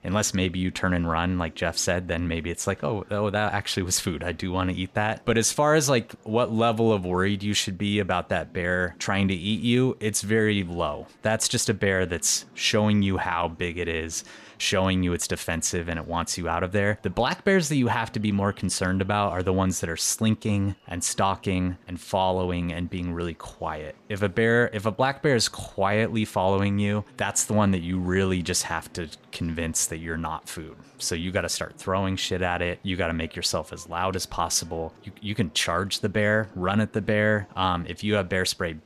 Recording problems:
murmuring crowd; faint; throughout; 30 dB below the speech

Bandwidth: 14.5 kHz